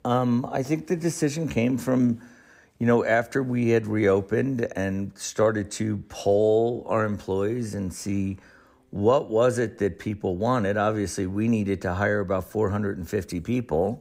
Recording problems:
none

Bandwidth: 15.5 kHz